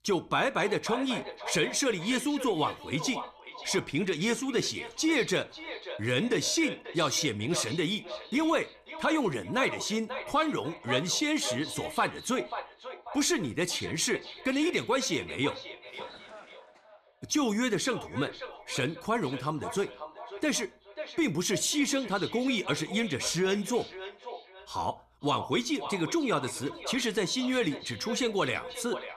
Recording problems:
echo of what is said; strong; throughout; 540 ms later, 10 dB below the speech

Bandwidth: 14.5 kHz